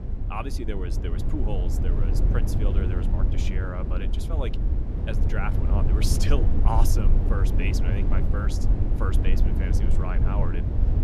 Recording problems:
low rumble; loud; throughout; 3 dB below the speech

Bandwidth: 14.5 kHz